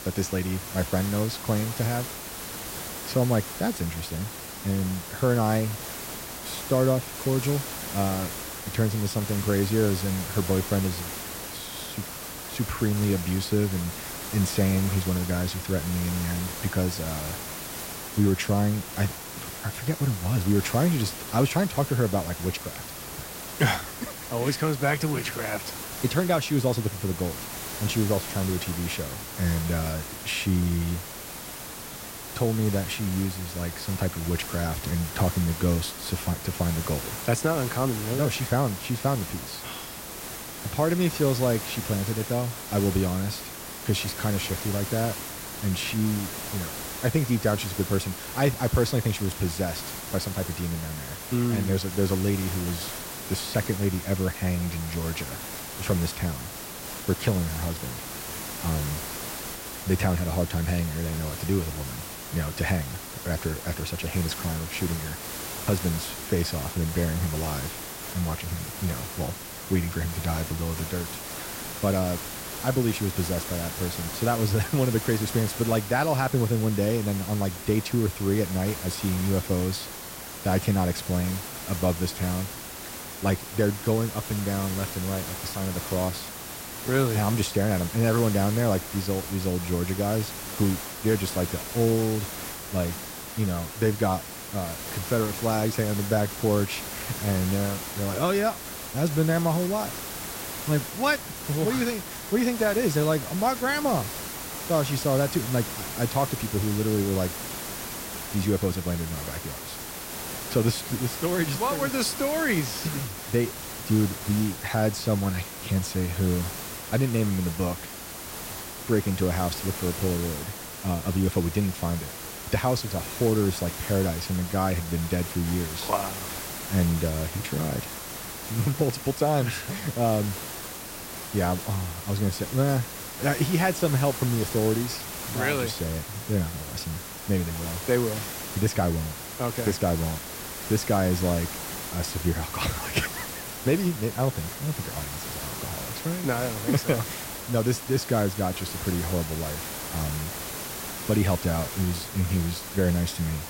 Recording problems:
hiss; loud; throughout; 7 dB below the speech

